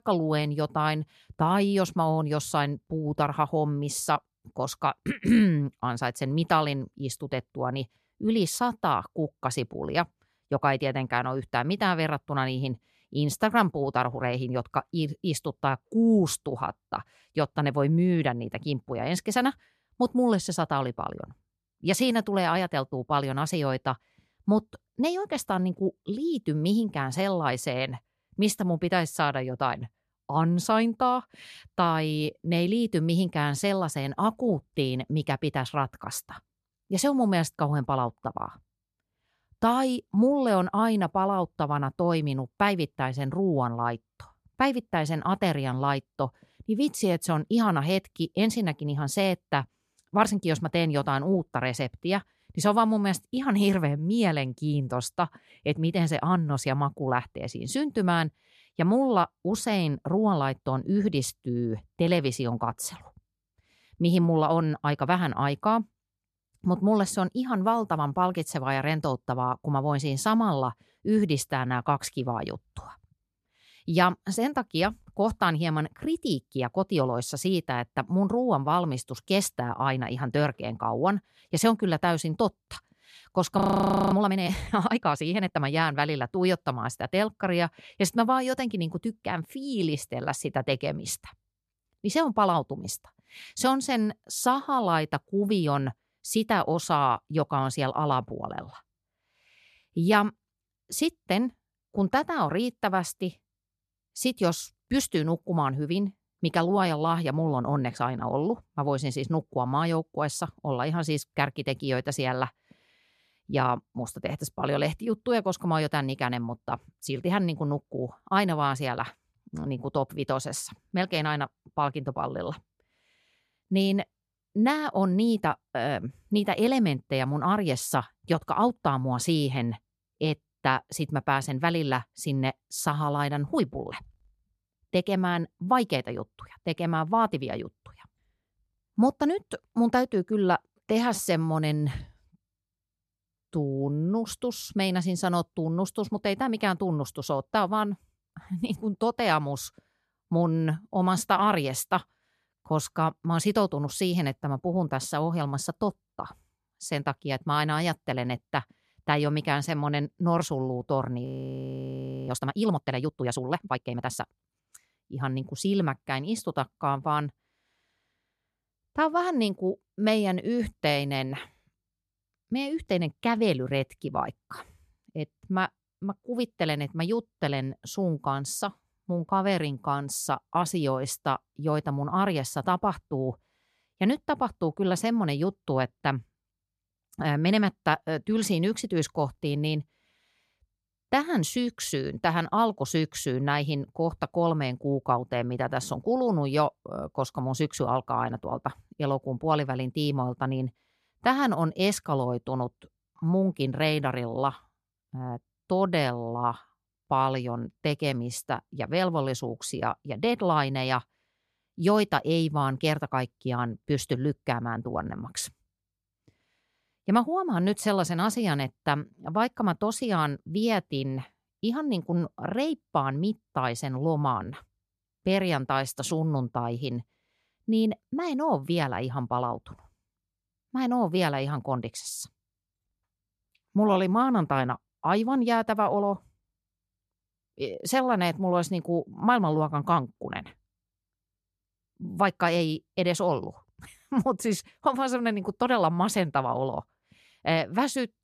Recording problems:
audio freezing; at 1:24 for 0.5 s and at 2:41 for 1 s

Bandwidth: 14 kHz